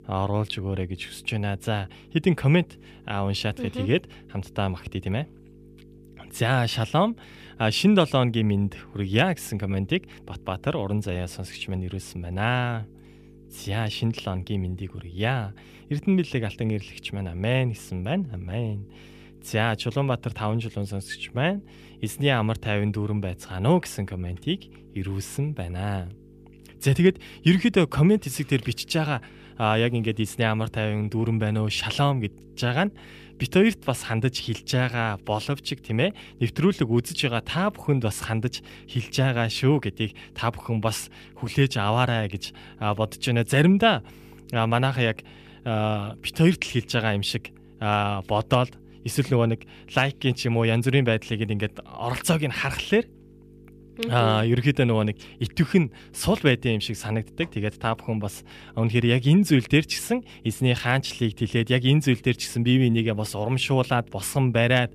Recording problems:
electrical hum; faint; throughout; 50 Hz, 30 dB below the speech

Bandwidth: 14.5 kHz